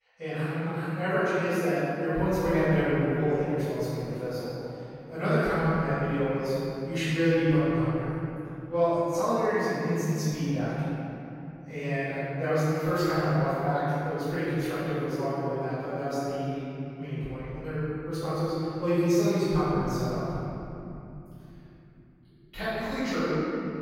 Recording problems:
room echo; strong; dies away in 3 s
off-mic speech; far

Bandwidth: 16 kHz